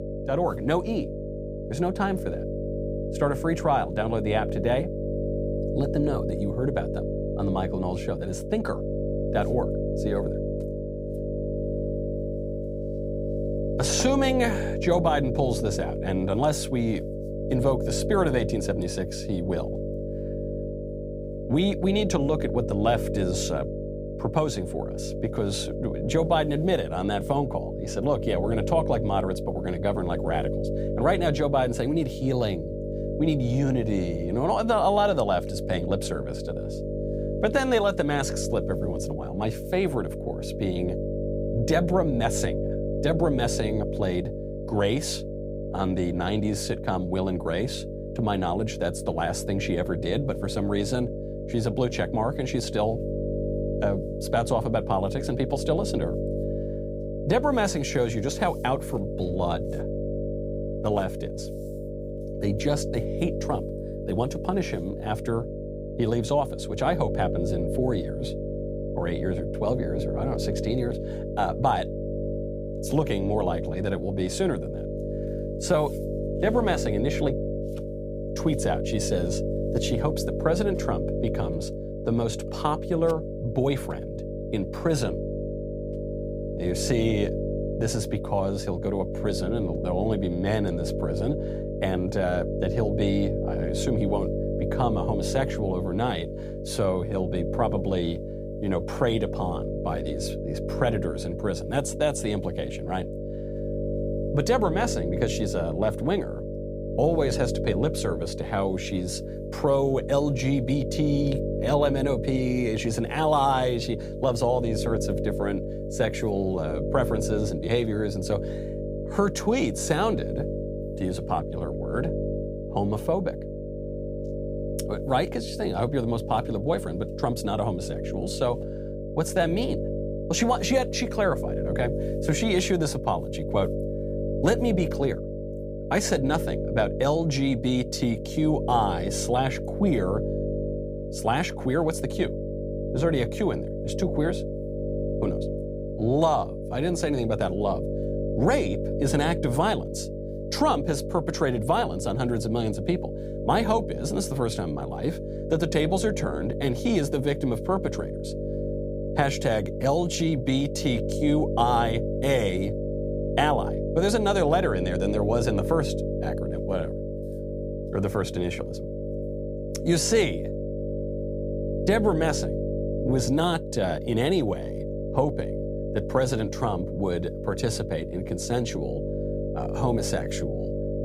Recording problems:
electrical hum; loud; throughout; 50 Hz, 5 dB below the speech

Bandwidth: 15.5 kHz